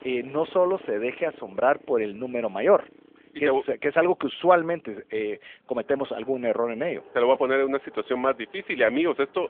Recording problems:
phone-call audio; nothing above 3.5 kHz
traffic noise; faint; throughout; 25 dB below the speech

